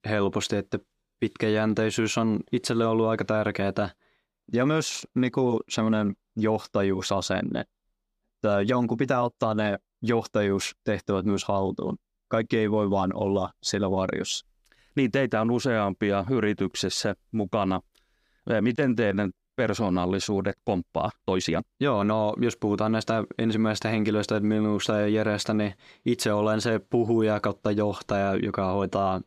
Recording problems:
uneven, jittery; strongly; from 11 to 22 s

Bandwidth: 15 kHz